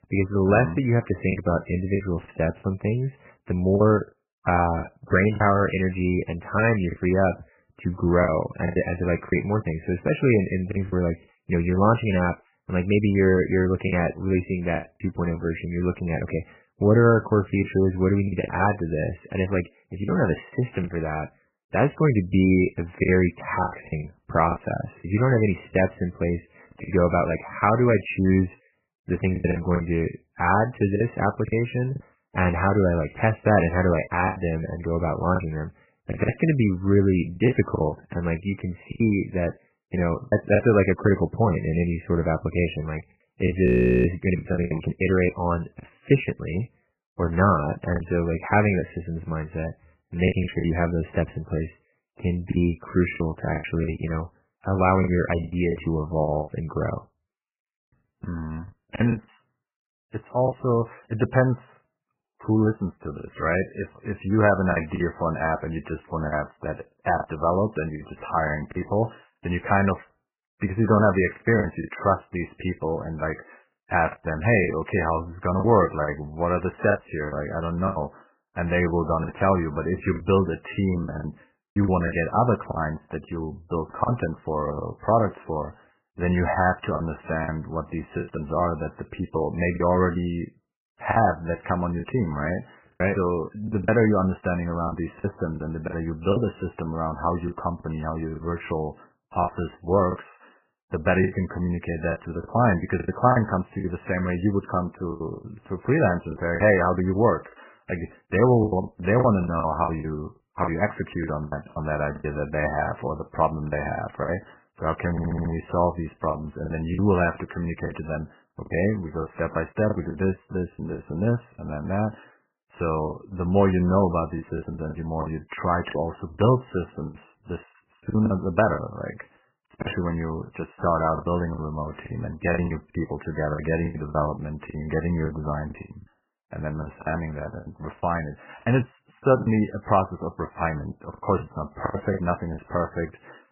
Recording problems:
garbled, watery; badly; nothing above 3 kHz
choppy; very; 7% of the speech affected
audio freezing; at 44 s
audio stuttering; at 1:55

